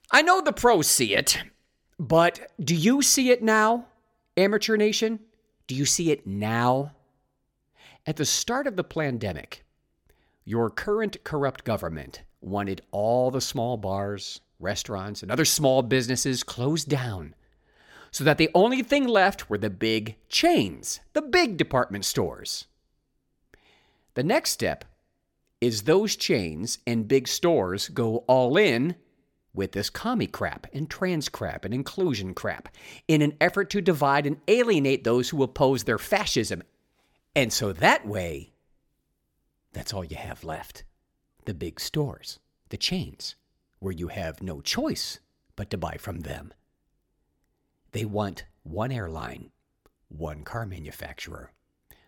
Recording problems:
none

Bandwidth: 17.5 kHz